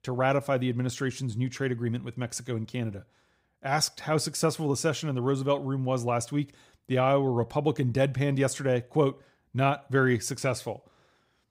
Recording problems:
none

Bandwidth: 15.5 kHz